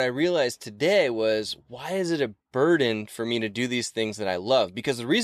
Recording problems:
abrupt cut into speech; at the start and the end

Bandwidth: 14.5 kHz